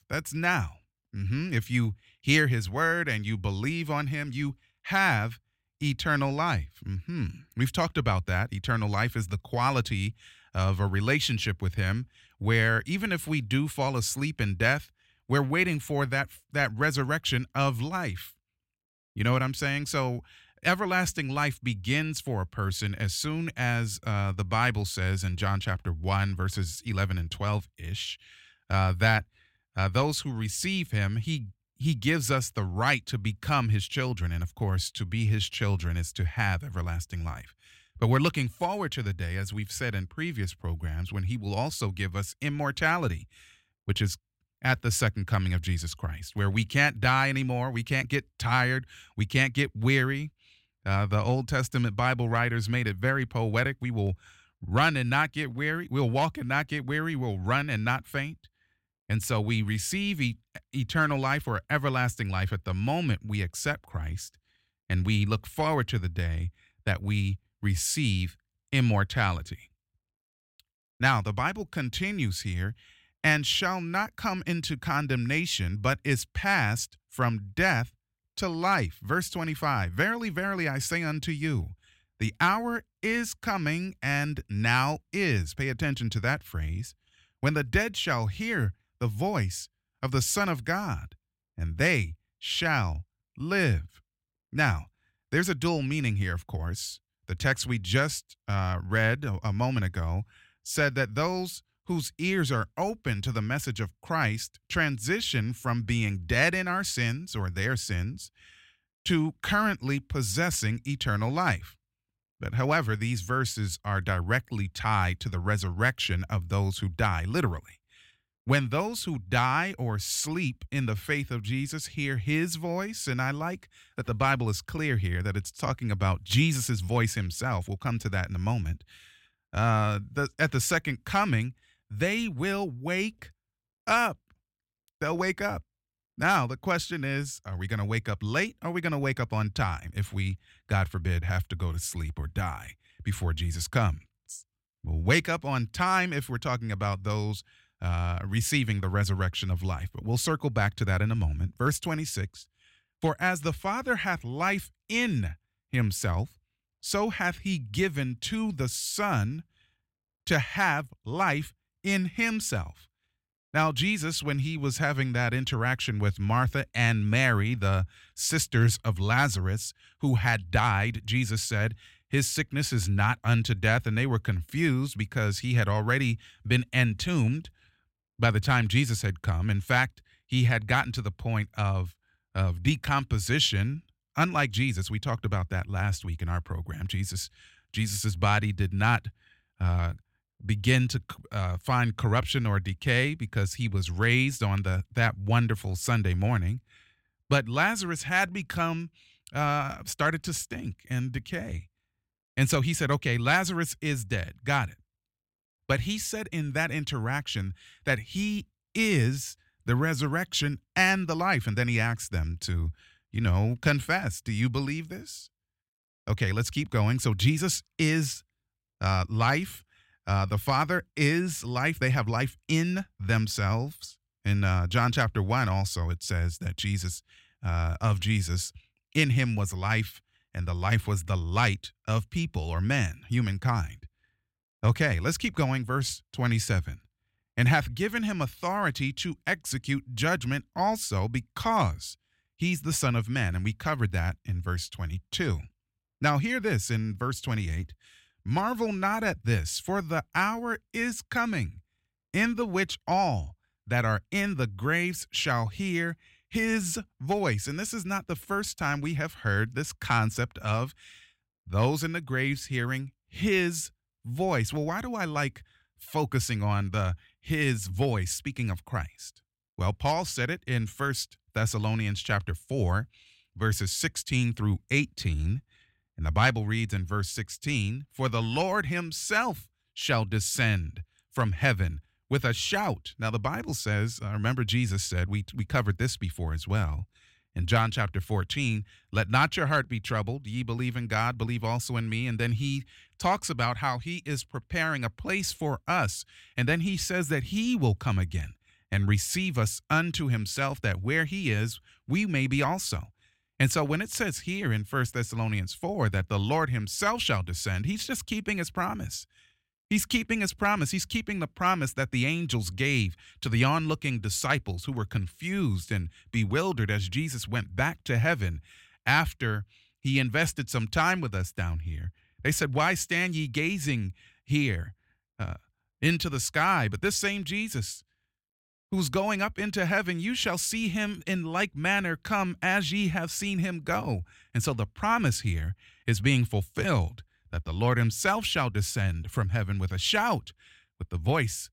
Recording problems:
none

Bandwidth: 16 kHz